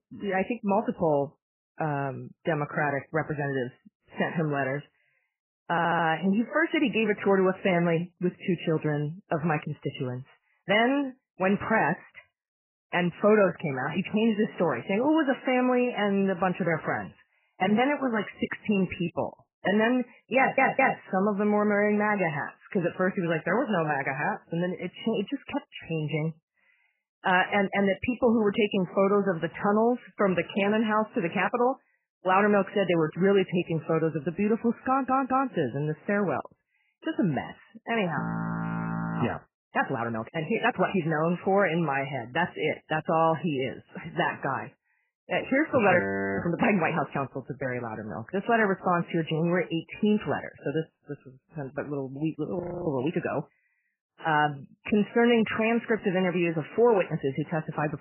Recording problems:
garbled, watery; badly; nothing above 3 kHz
audio stuttering; at 5.5 s, at 20 s and at 35 s
audio freezing; at 38 s for 1 s, at 46 s and at 53 s

